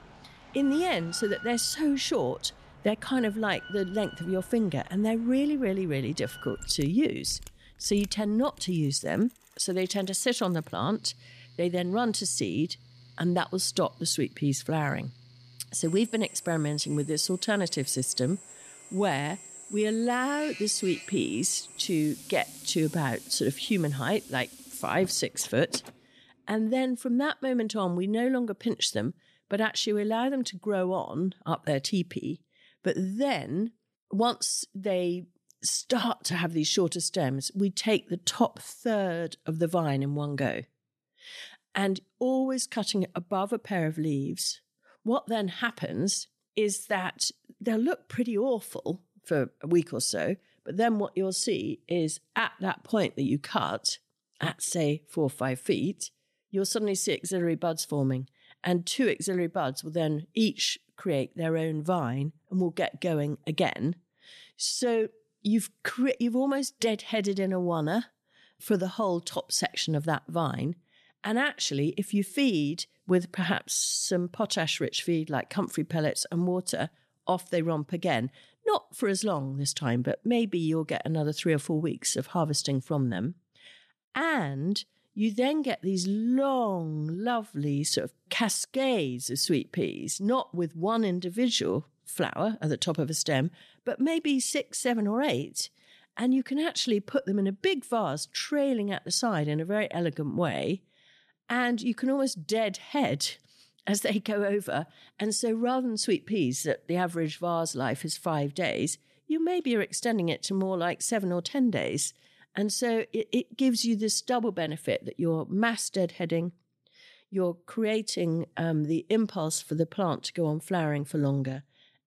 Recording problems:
machinery noise; noticeable; until 25 s; 15 dB below the speech

